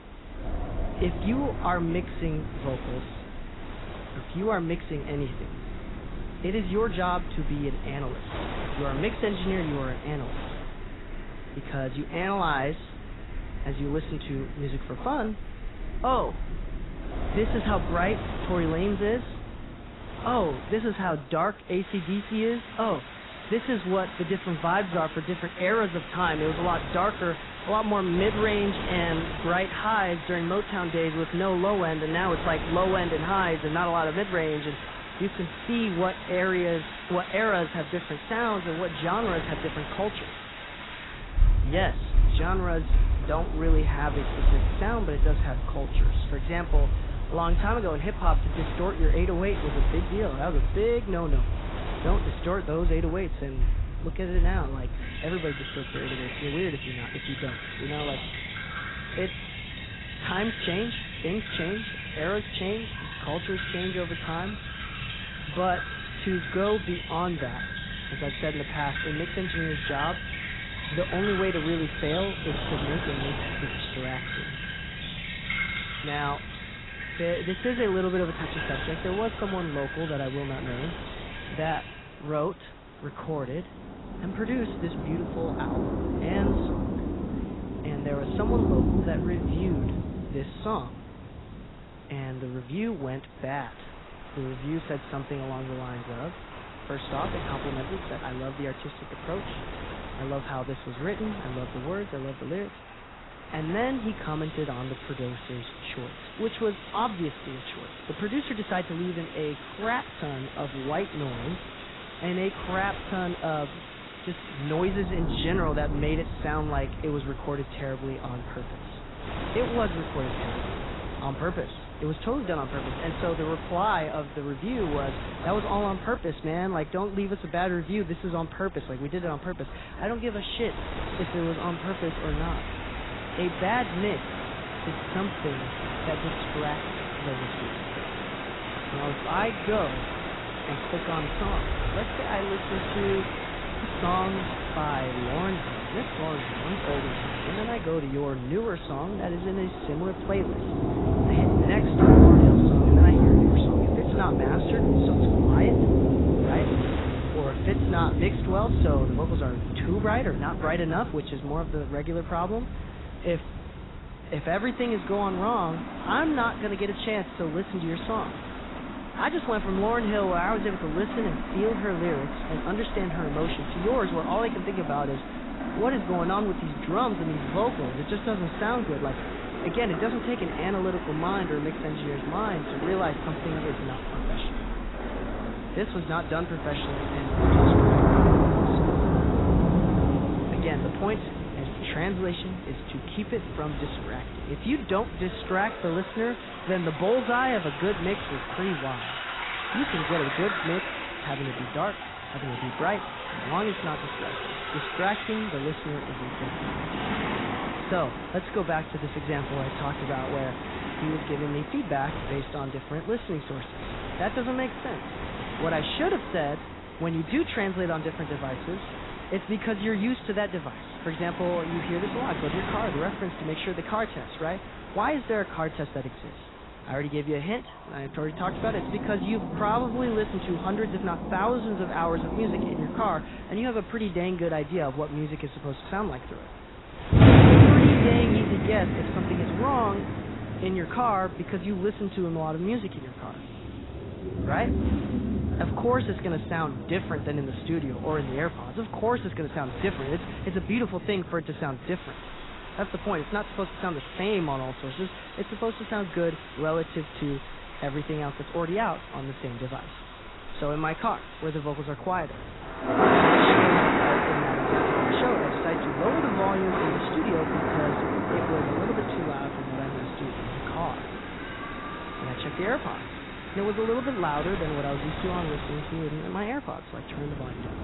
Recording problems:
garbled, watery; badly; nothing above 4 kHz
rain or running water; very loud; throughout; 1 dB above the speech
wind noise on the microphone; occasional gusts; 15 dB below the speech

